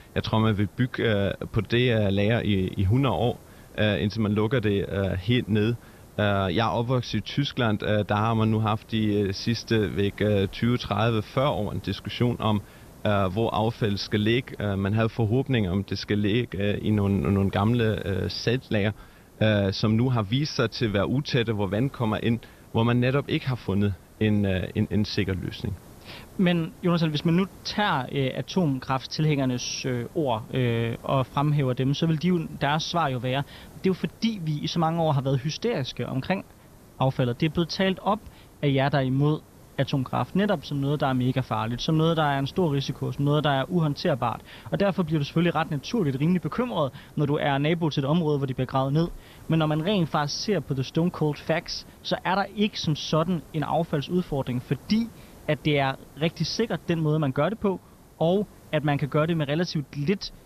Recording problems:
high frequencies cut off; noticeable; nothing above 6 kHz
hiss; faint; throughout; 25 dB below the speech

